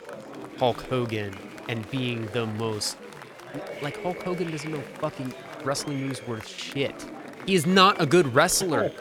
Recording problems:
chatter from many people; noticeable; throughout; 15 dB below the speech

